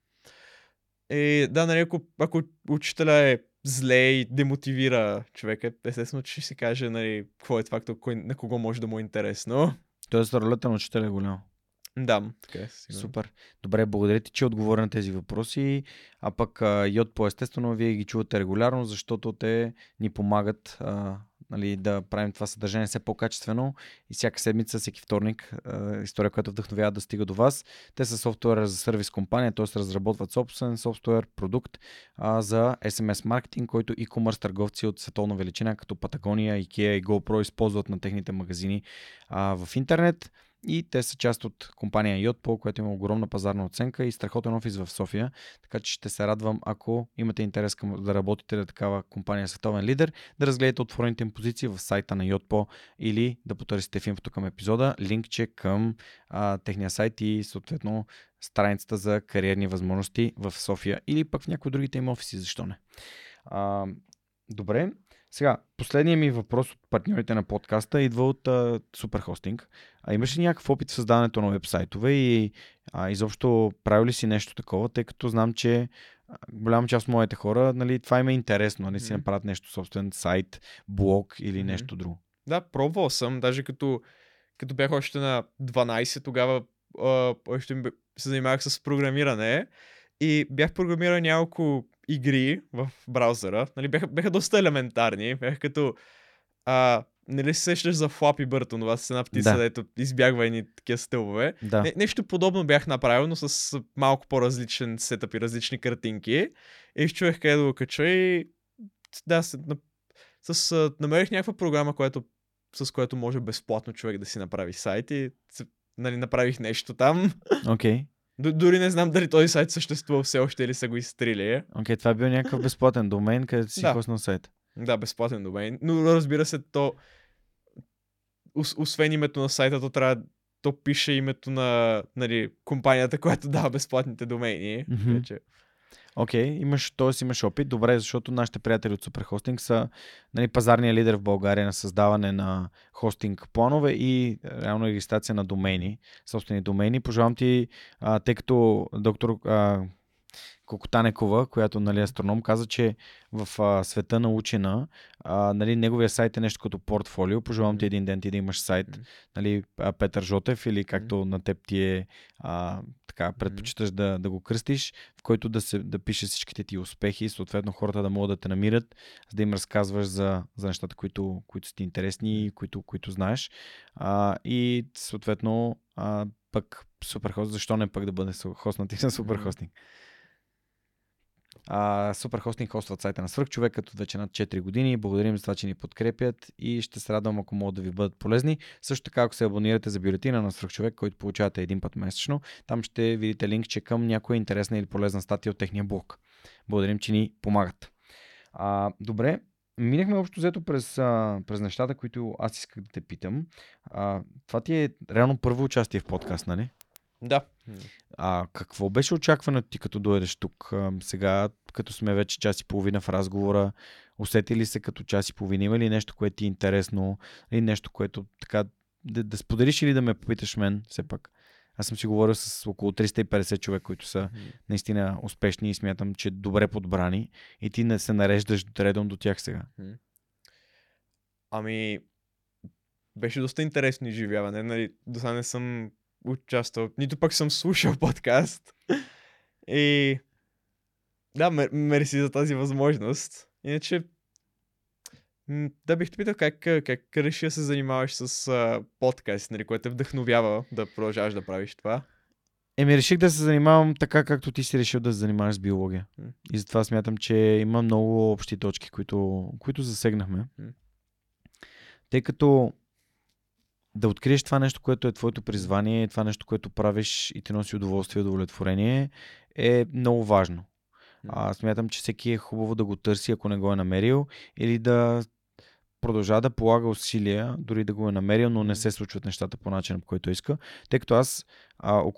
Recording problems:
none

